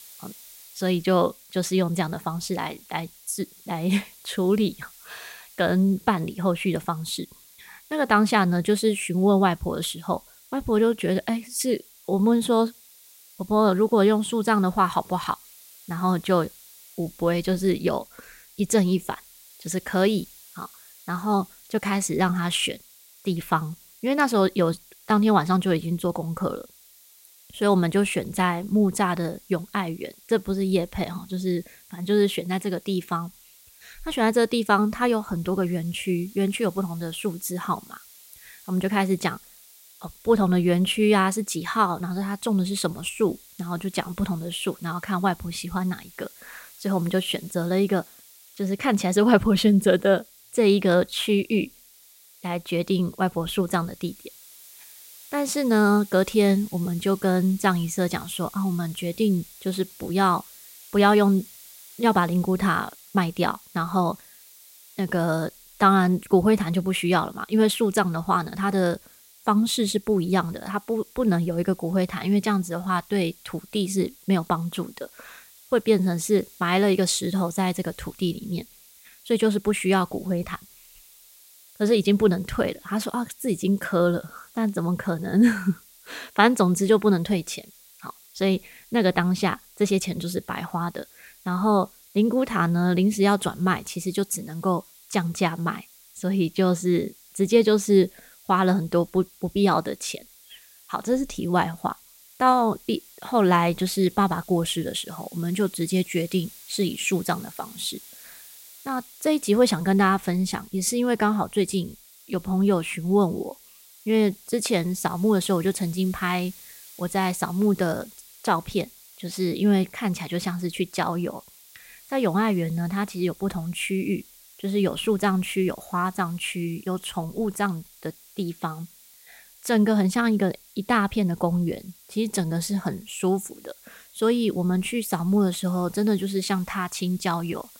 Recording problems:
hiss; faint; throughout; 25 dB below the speech

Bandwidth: 16 kHz